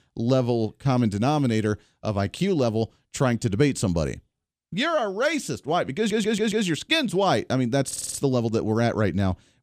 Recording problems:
audio stuttering; at 6 s and at 8 s

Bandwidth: 14.5 kHz